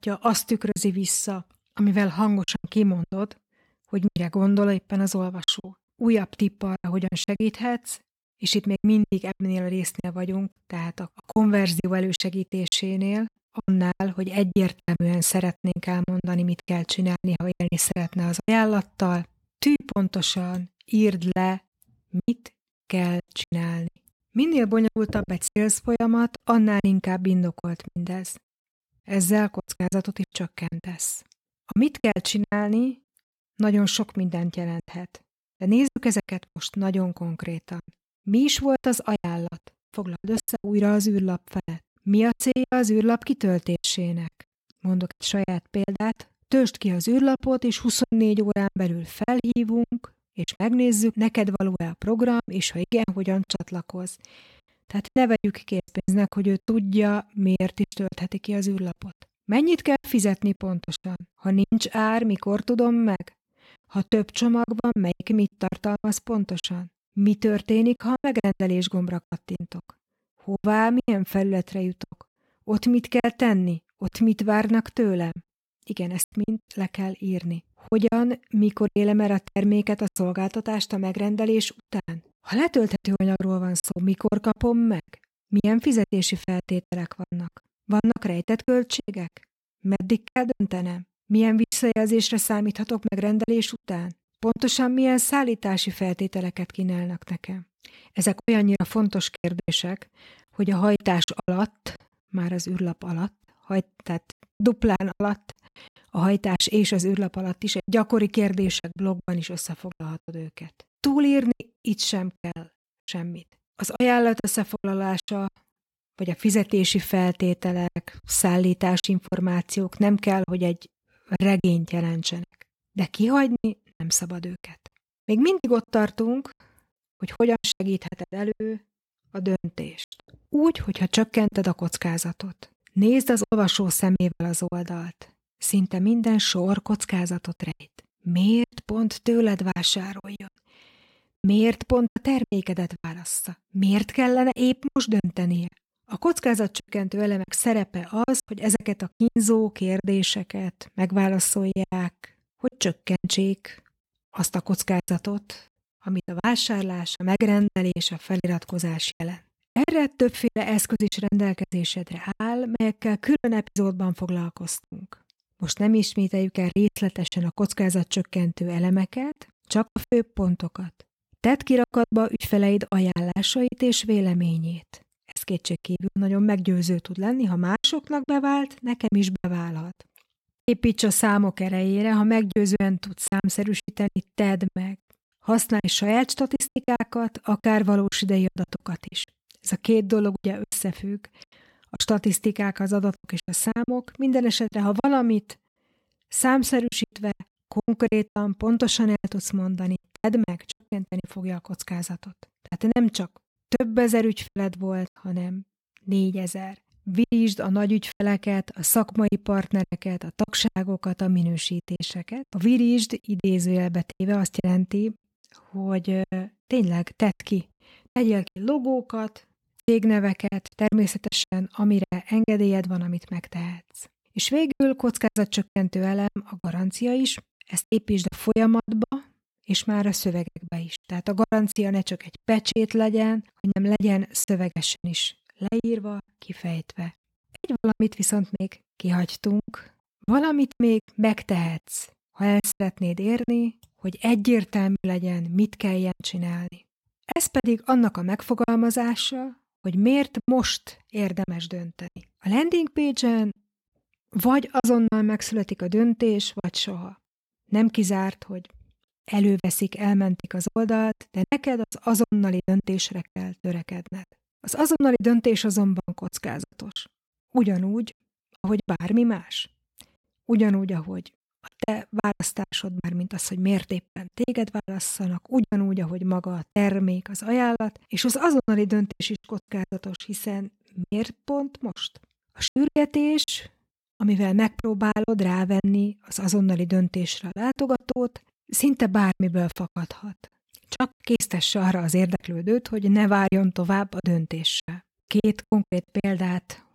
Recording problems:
choppy; very; 12% of the speech affected

